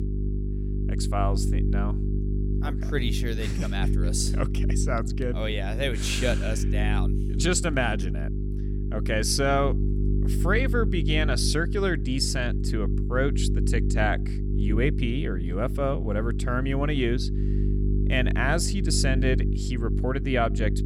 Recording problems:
electrical hum; loud; throughout; 50 Hz, 10 dB below the speech

